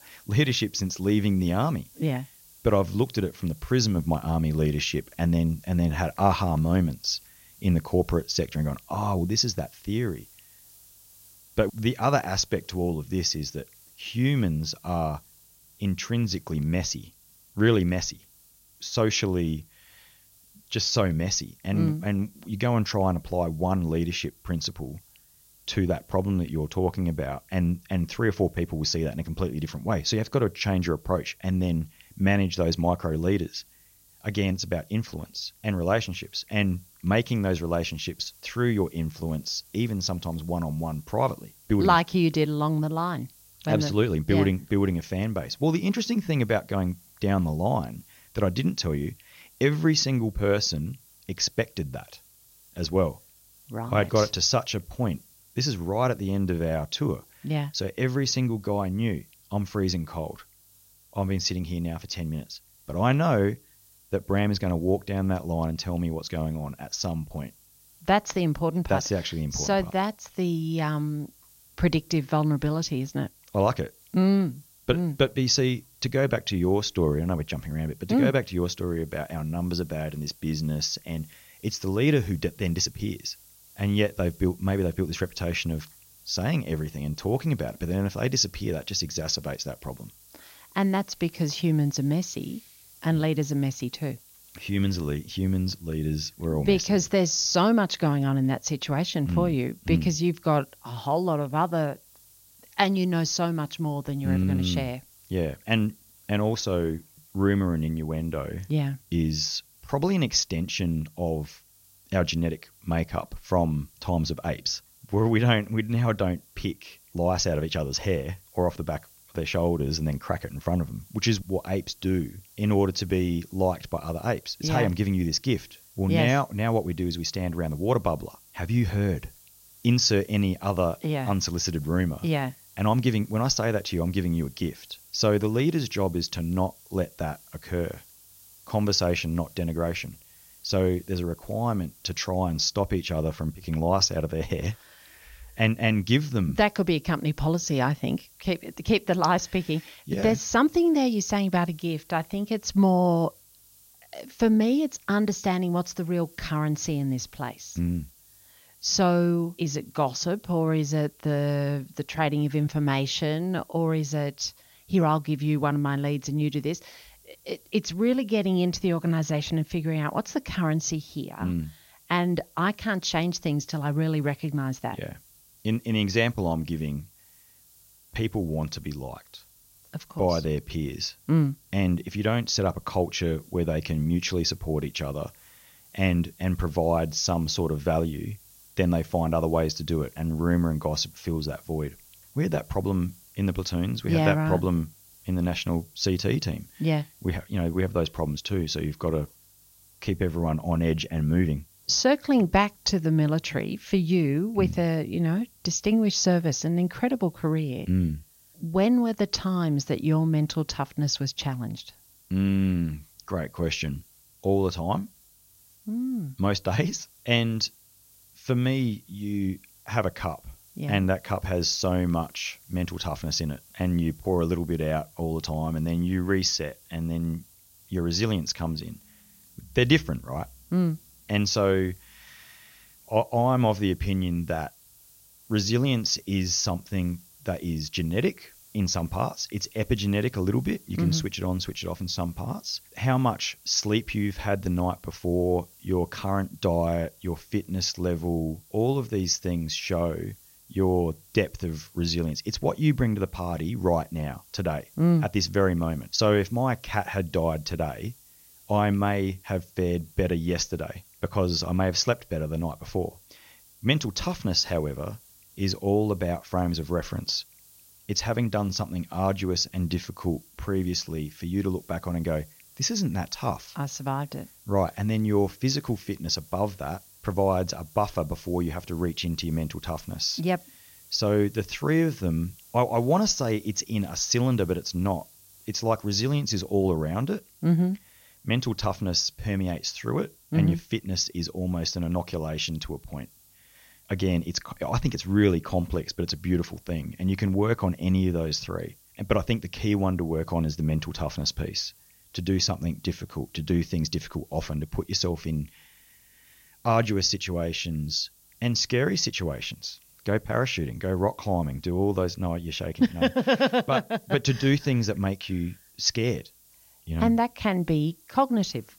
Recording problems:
high frequencies cut off; noticeable; nothing above 6.5 kHz
hiss; faint; throughout; 25 dB below the speech

